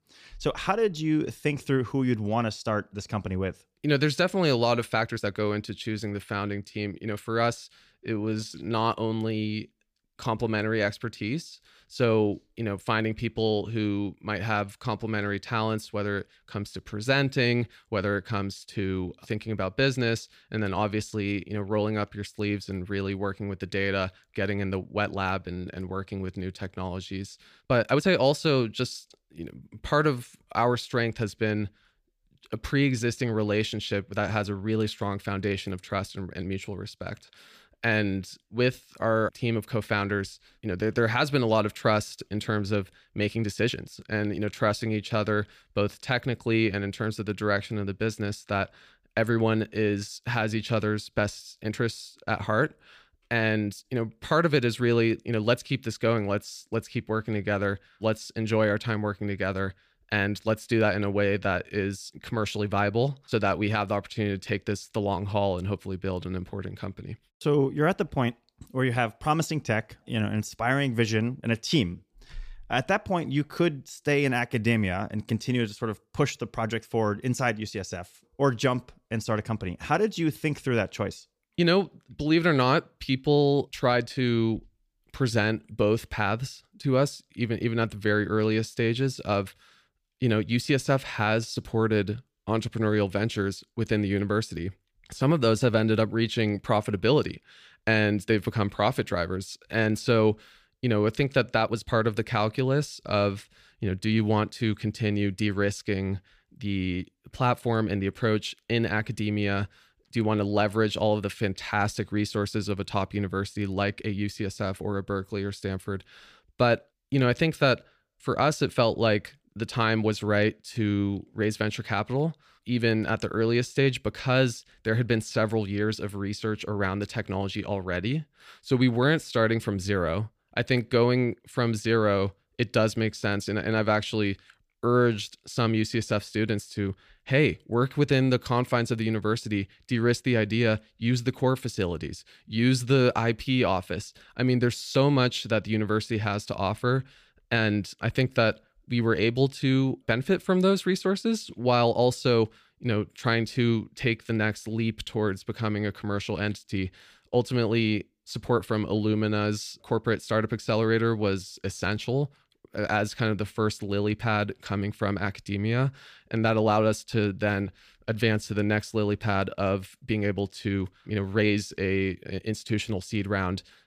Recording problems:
uneven, jittery; strongly; from 5 s to 1:42

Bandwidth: 15 kHz